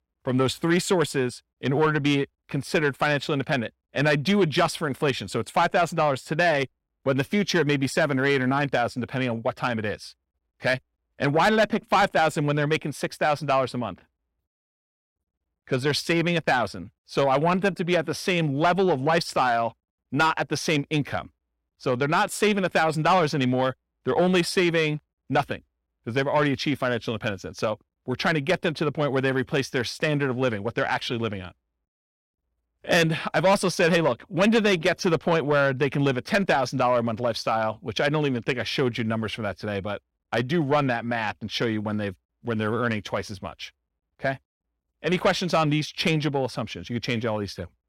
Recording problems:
distortion; slight; 10 dB below the speech

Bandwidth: 16 kHz